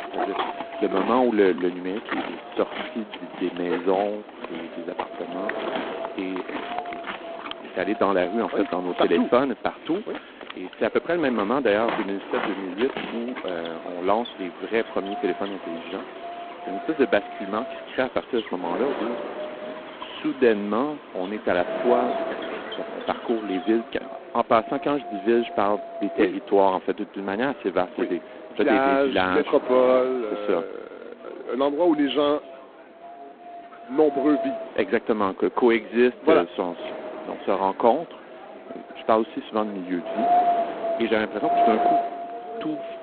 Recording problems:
phone-call audio; poor line; nothing above 4 kHz
wind noise on the microphone; heavy; 5 dB below the speech
animal sounds; noticeable; until 24 s; 10 dB below the speech
chatter from many people; faint; throughout; 20 dB below the speech

